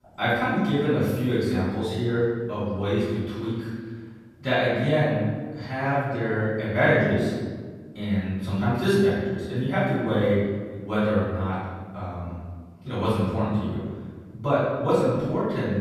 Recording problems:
room echo; strong; dies away in 1.5 s
off-mic speech; far

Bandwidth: 14.5 kHz